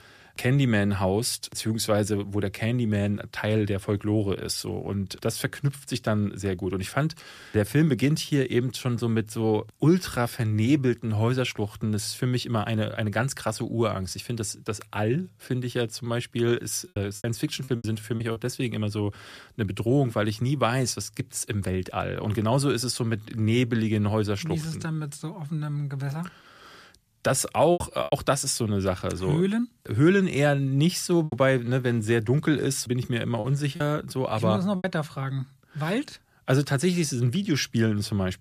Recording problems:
choppy; very; from 17 to 18 s, at 28 s and from 31 to 35 s; 9% of the speech affected

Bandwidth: 14.5 kHz